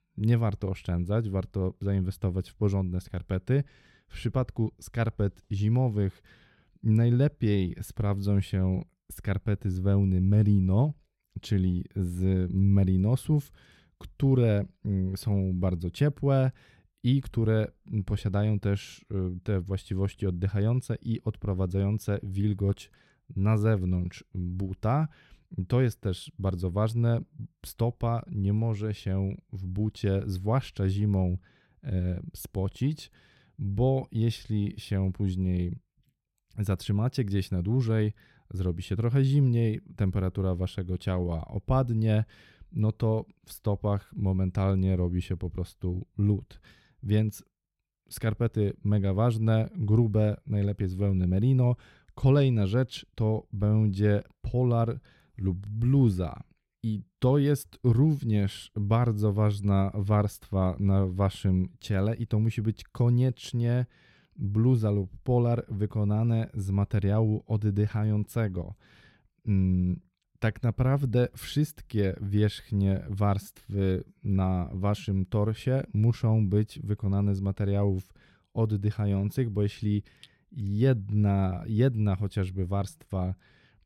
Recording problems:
none

